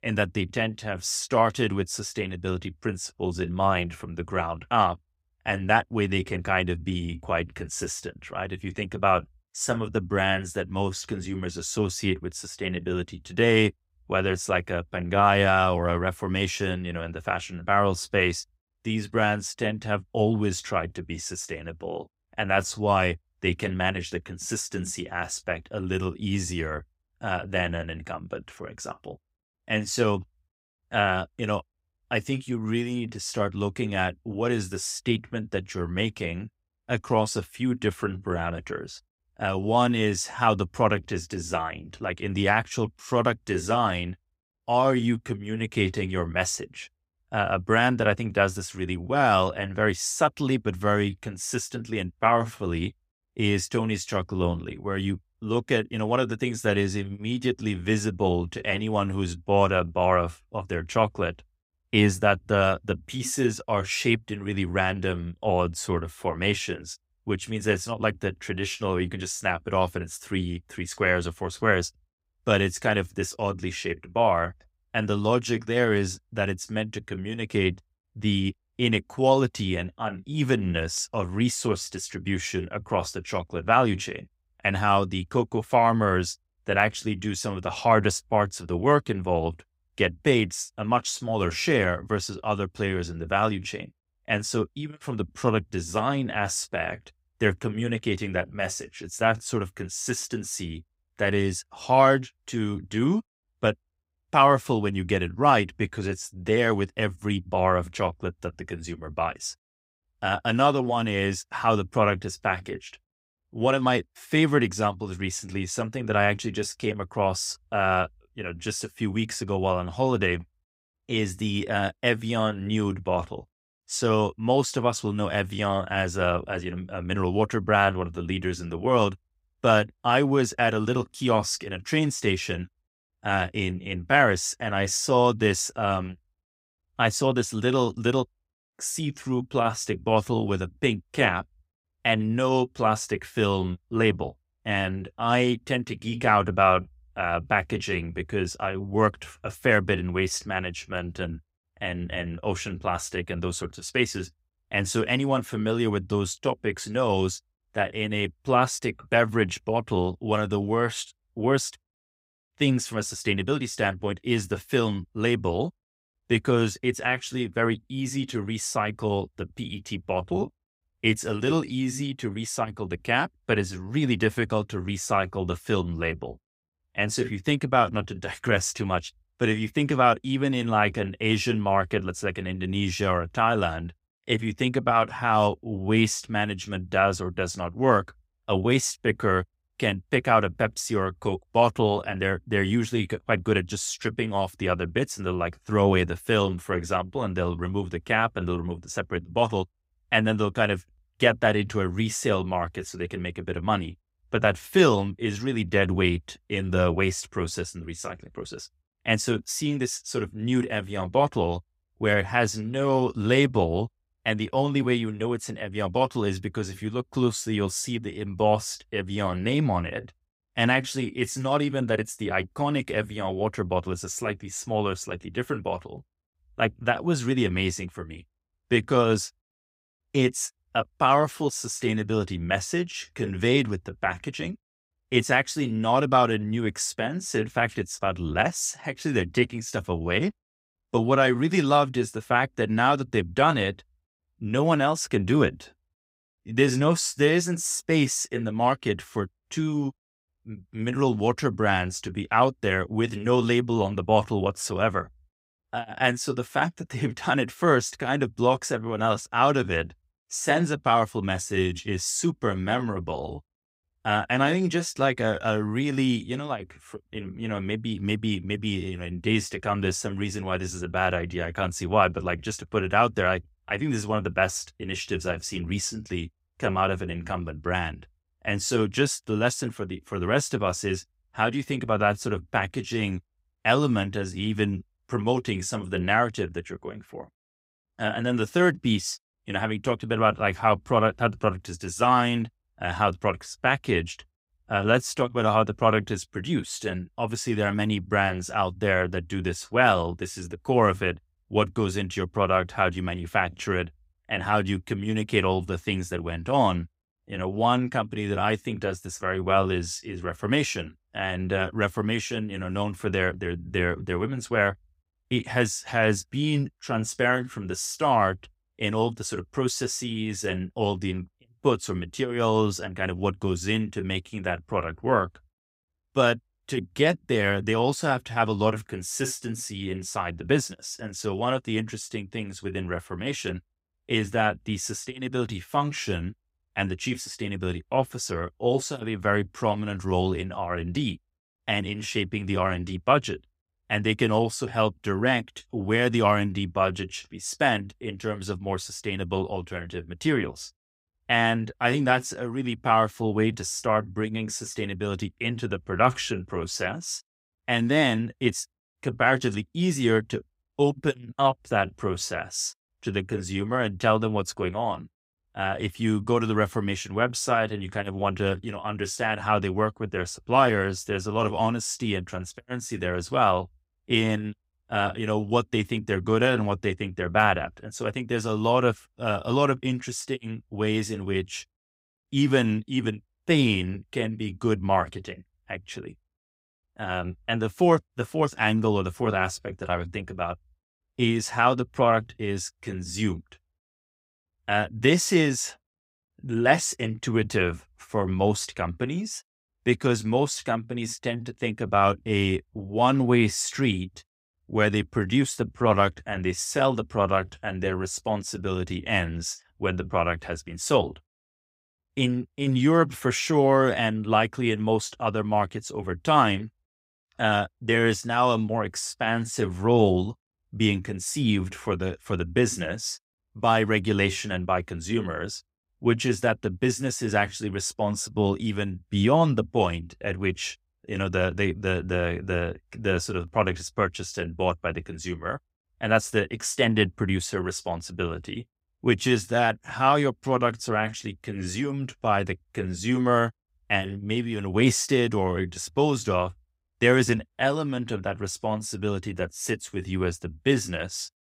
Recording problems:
none

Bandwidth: 15.5 kHz